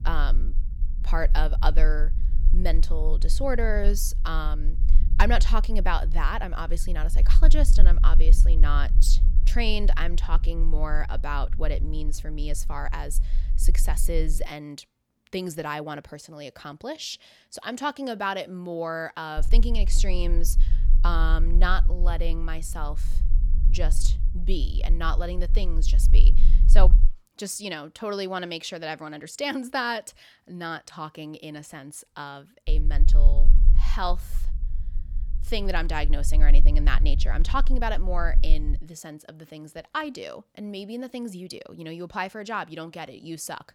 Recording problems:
low rumble; noticeable; until 14 s, from 19 to 27 s and from 33 to 39 s; 20 dB below the speech

